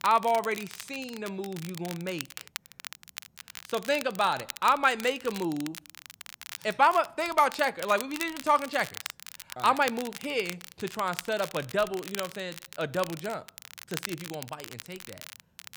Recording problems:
crackle, like an old record; noticeable; 15 dB below the speech

